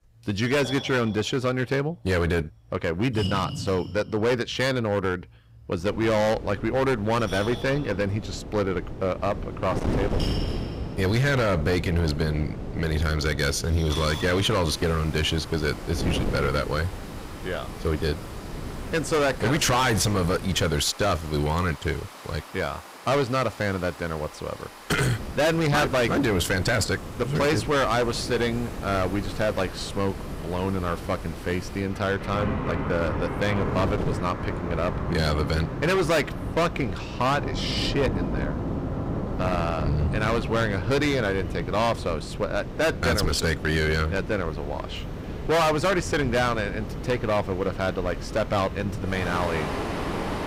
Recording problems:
distortion; heavy; 11% of the sound clipped
rain or running water; loud; throughout; 10 dB below the speech
wind noise on the microphone; occasional gusts; from 6 to 21 s and from 25 s on; 15 dB below the speech

